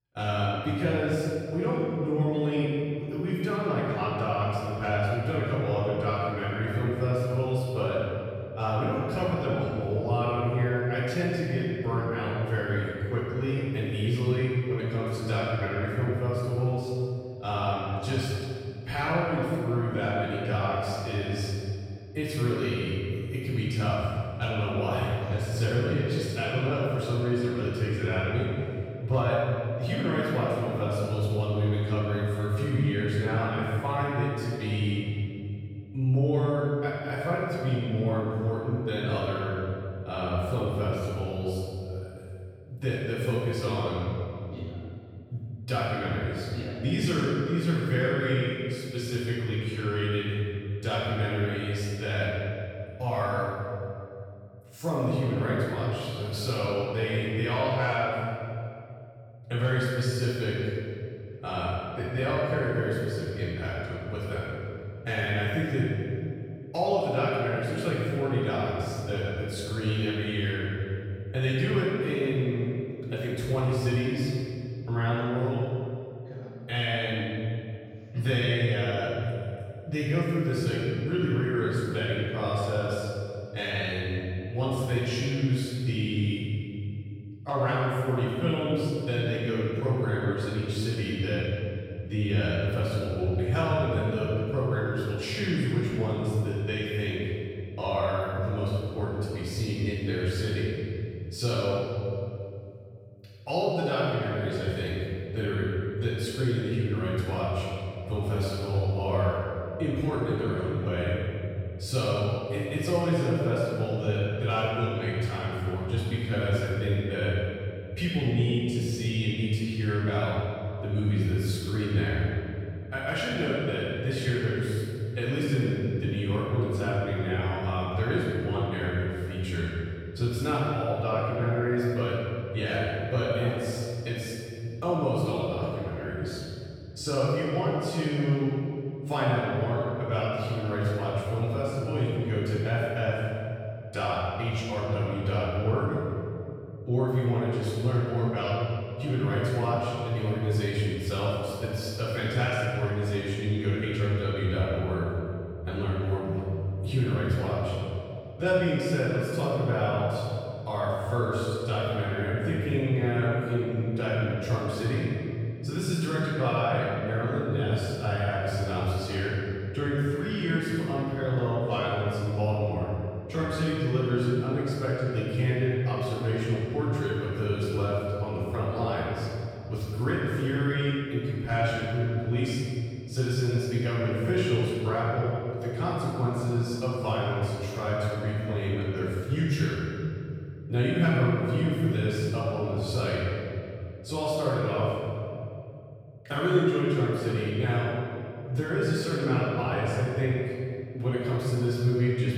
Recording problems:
room echo; strong; dies away in 2.7 s
off-mic speech; far

